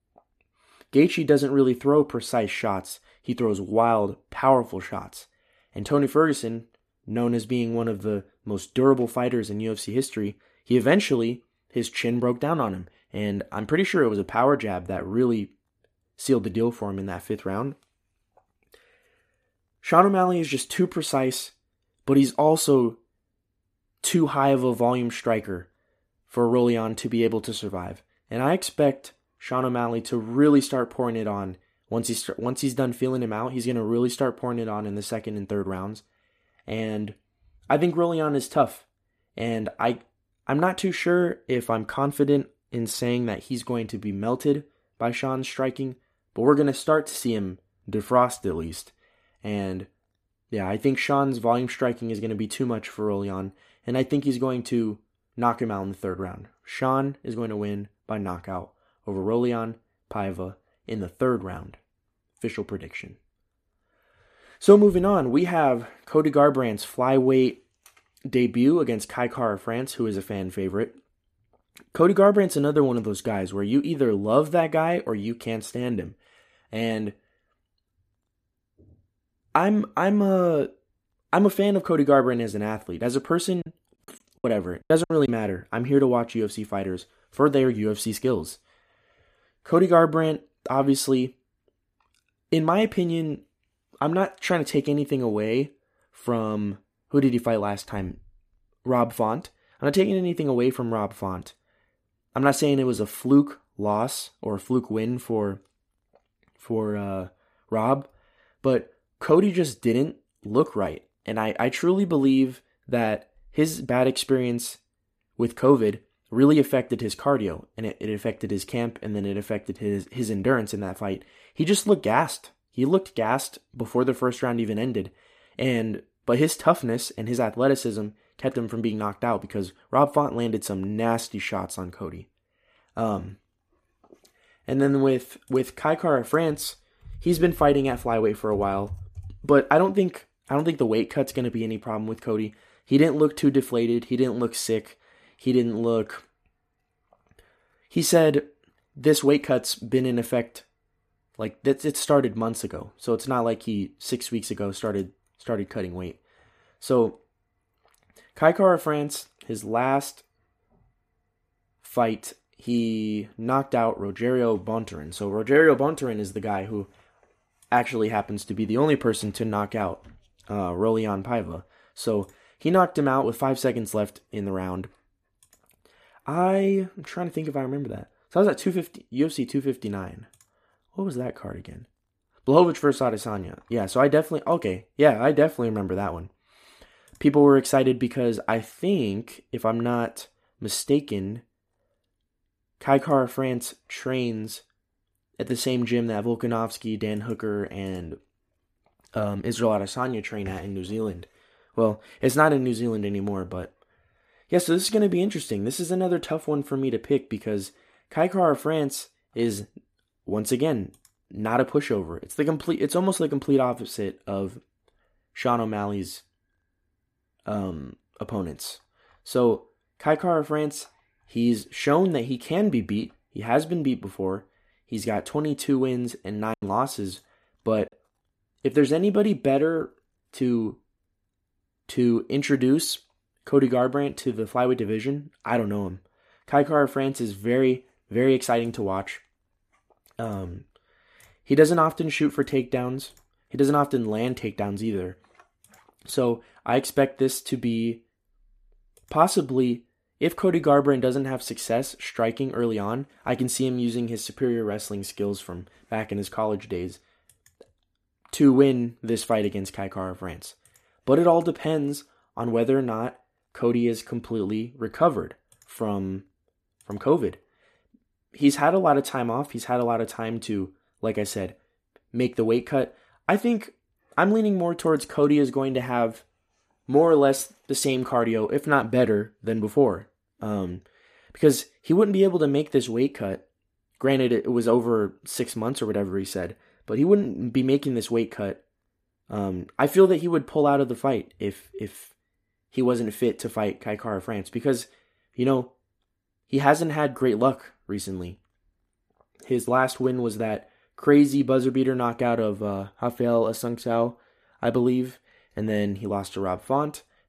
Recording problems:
choppy; very; from 1:24 to 1:25 and at 3:47; 16% of the speech affected

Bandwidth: 14.5 kHz